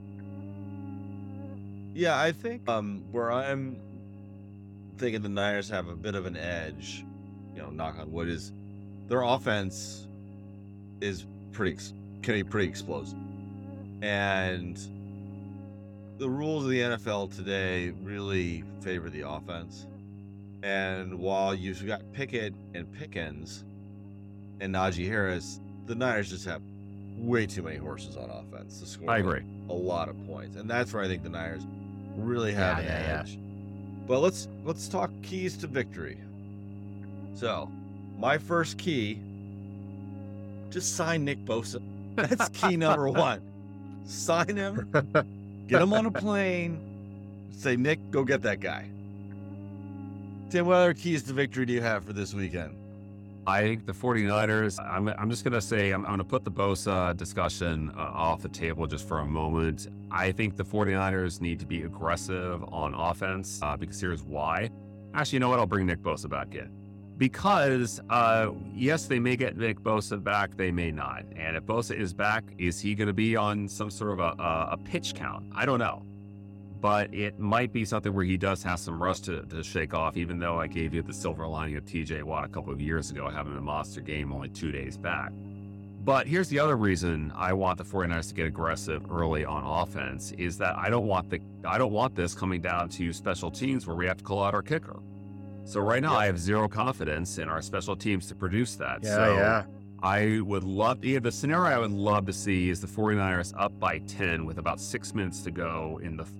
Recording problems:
electrical hum; faint; throughout; 50 Hz, 20 dB below the speech

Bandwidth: 17 kHz